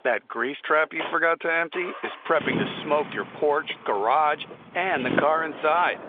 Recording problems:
phone-call audio; nothing above 3.5 kHz
traffic noise; loud; throughout; 10 dB below the speech

